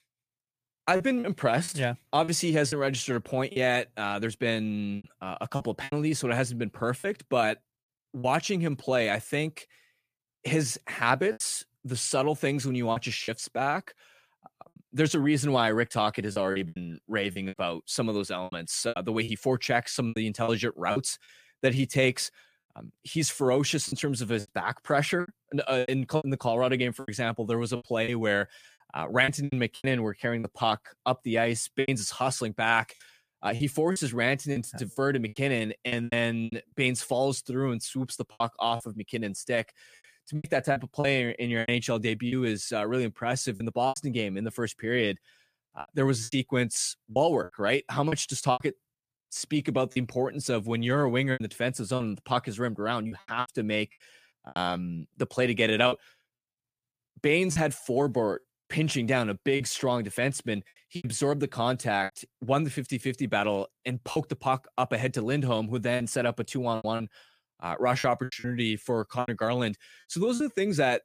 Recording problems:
choppy; very; 8% of the speech affected

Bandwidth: 15 kHz